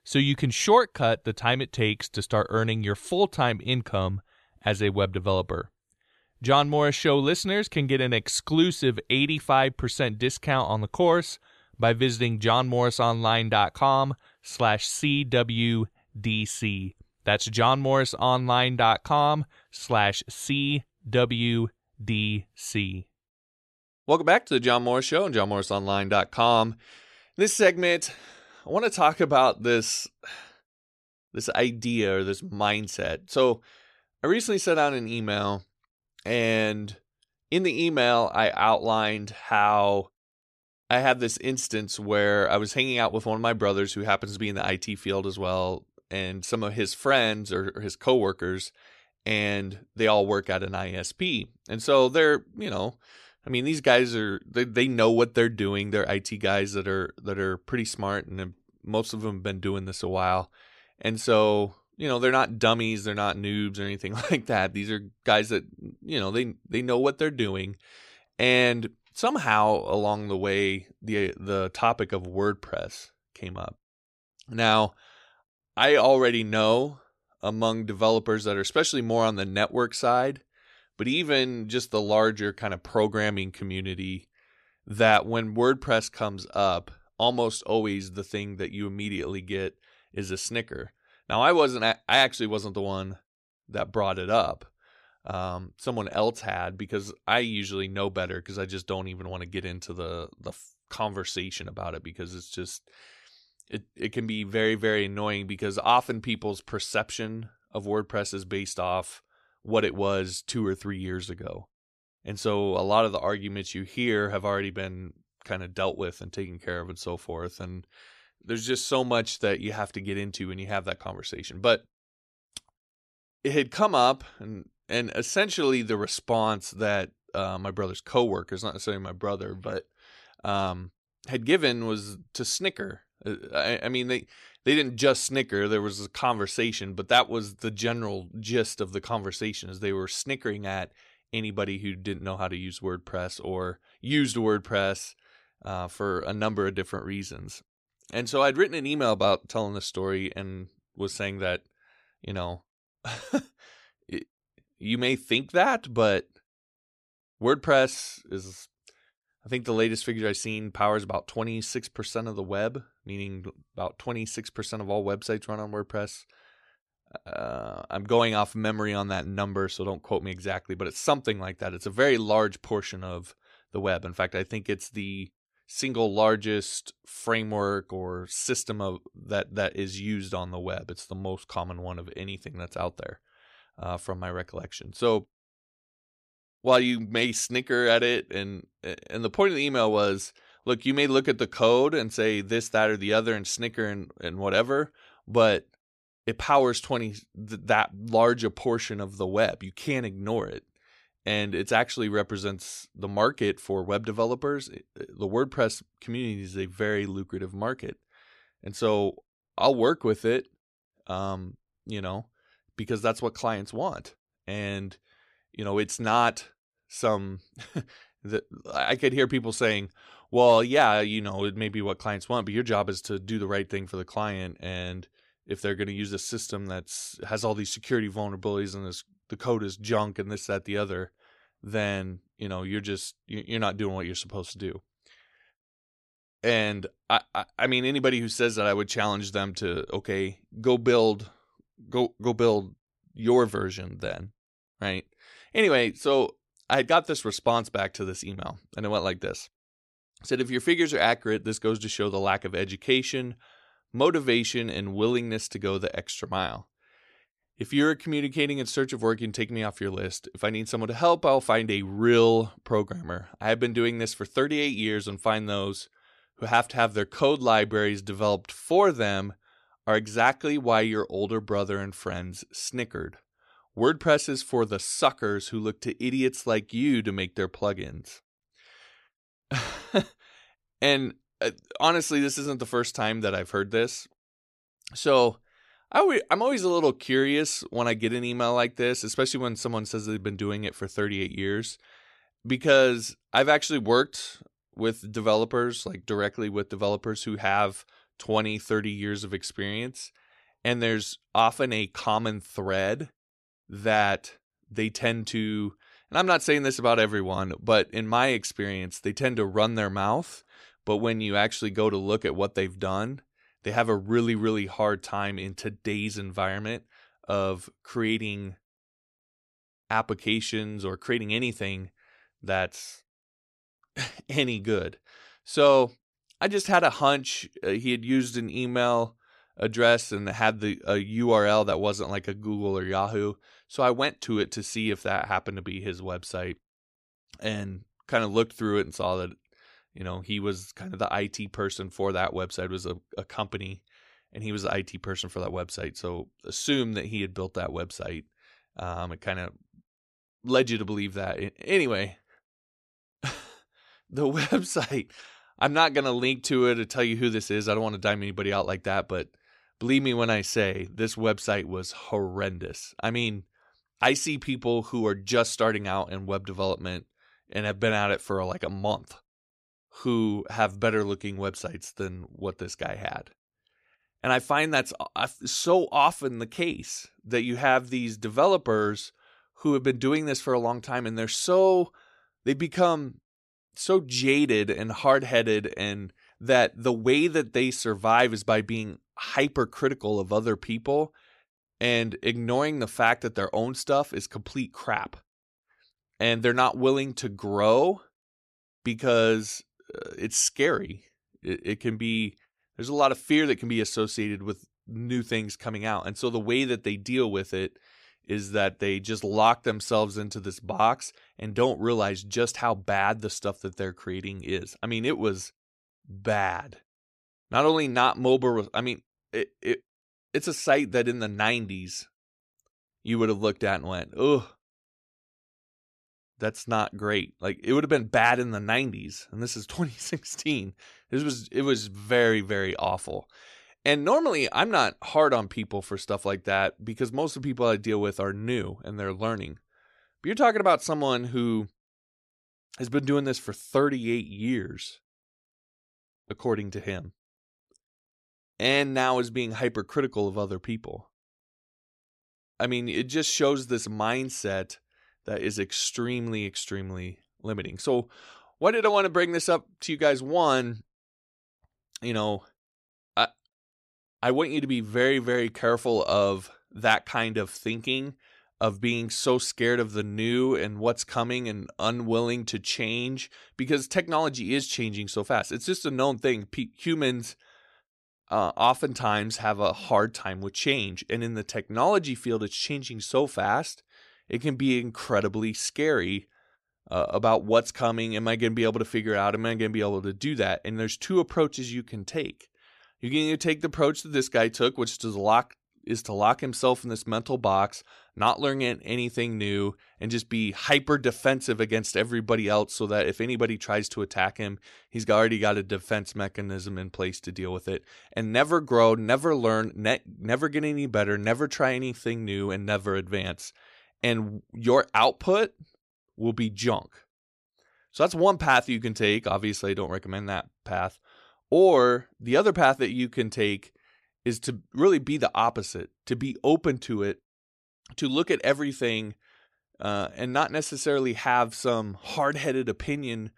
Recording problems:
none

